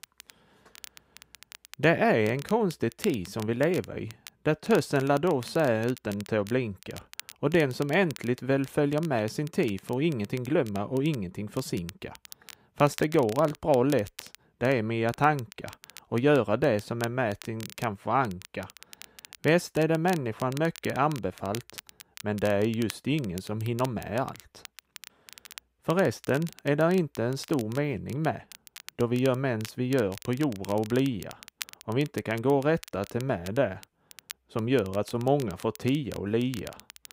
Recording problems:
crackle, like an old record; noticeable; 20 dB below the speech

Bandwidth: 15.5 kHz